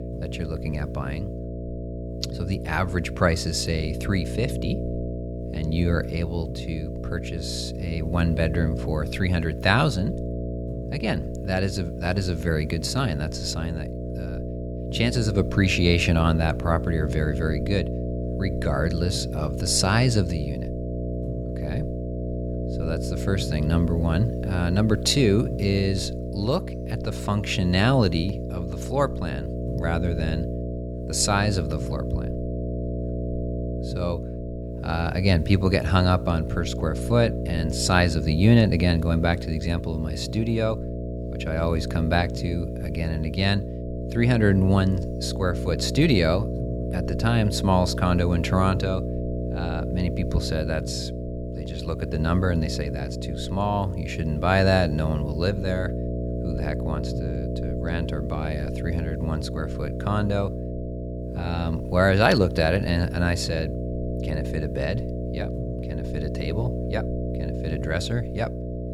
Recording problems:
electrical hum; loud; throughout; 60 Hz, 9 dB below the speech

